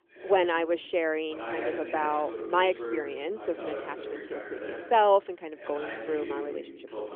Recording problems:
phone-call audio; nothing above 3 kHz
voice in the background; loud; throughout; 10 dB below the speech

